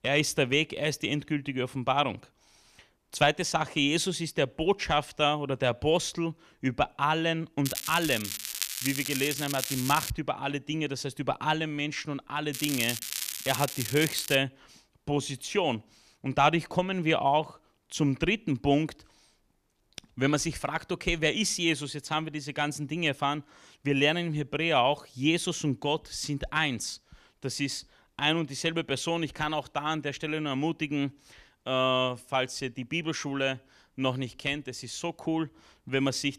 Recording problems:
crackling; loud; from 7.5 to 10 s and from 13 to 14 s; 4 dB below the speech

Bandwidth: 14.5 kHz